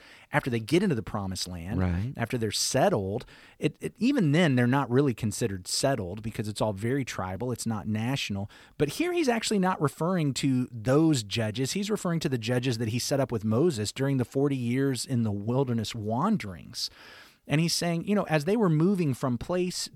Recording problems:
none

